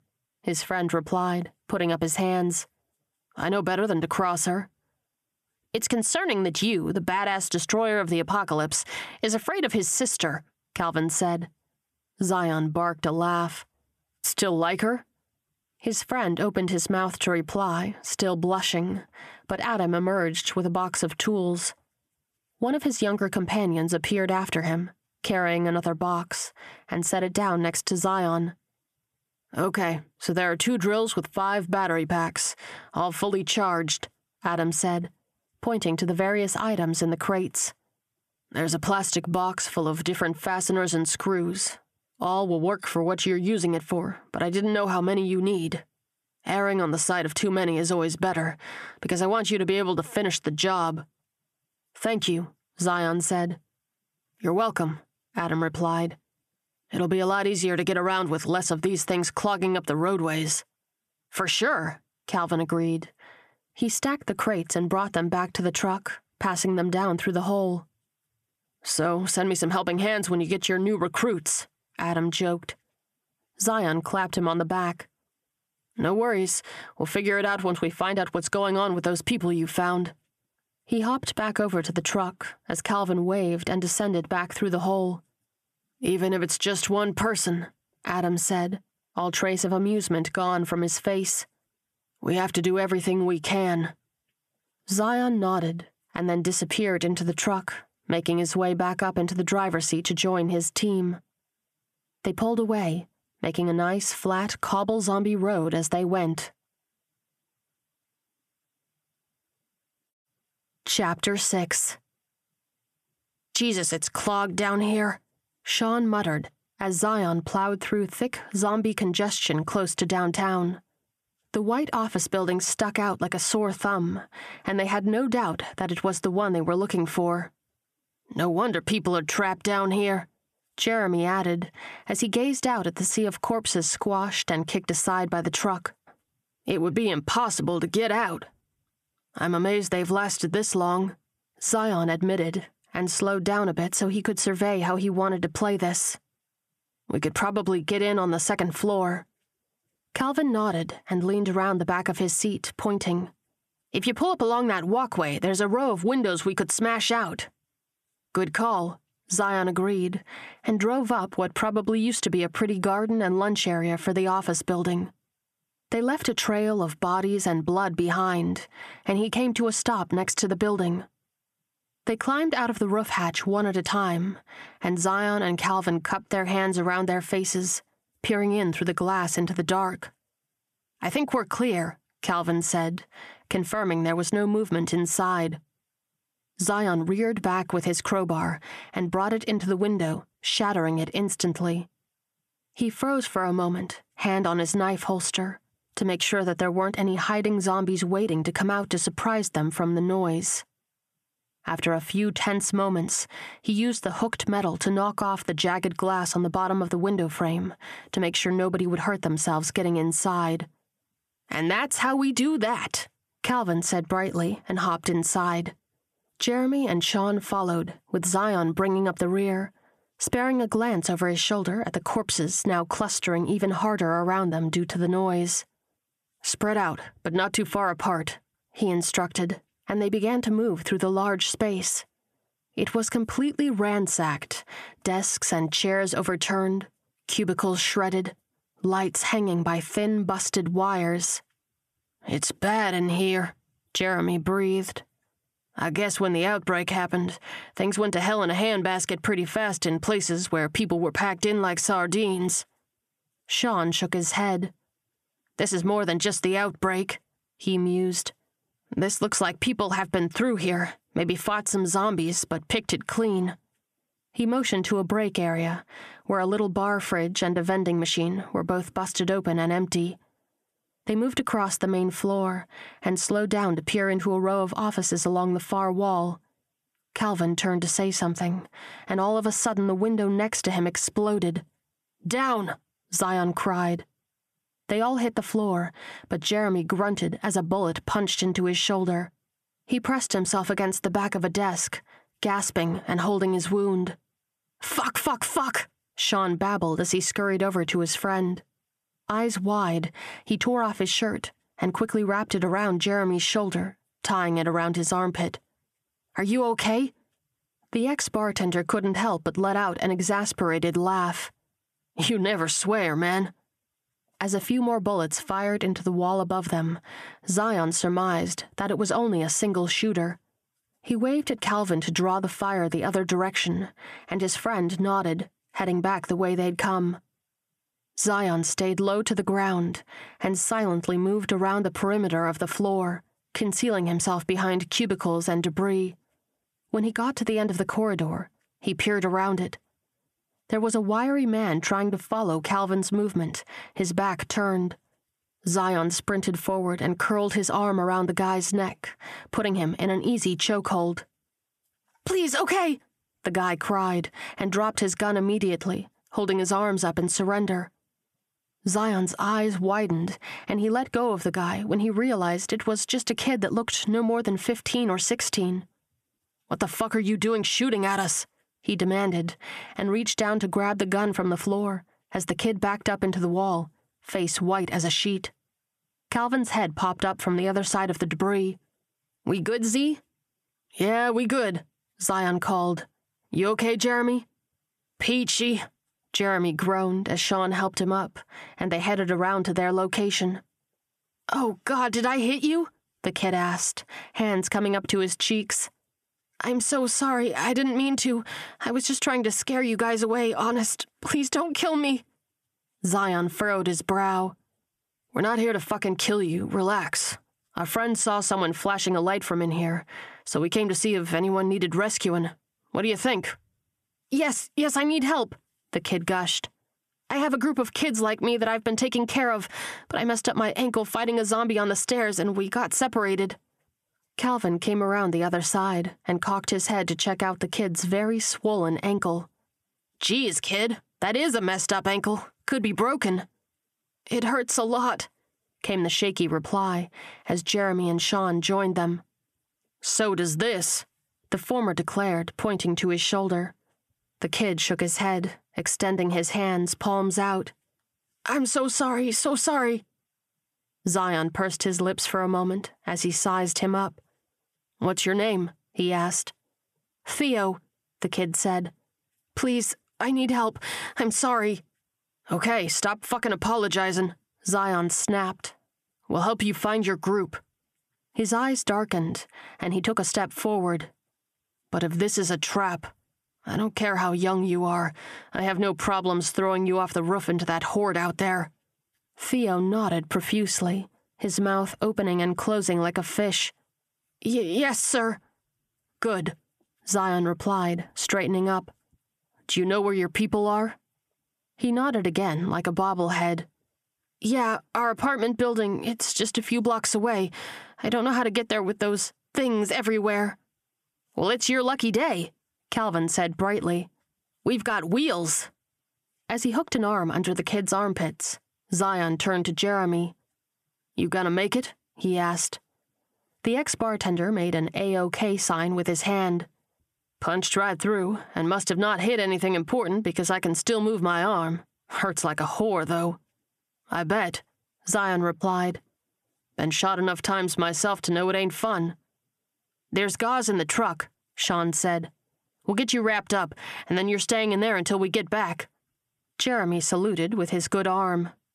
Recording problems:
squashed, flat; somewhat

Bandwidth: 14.5 kHz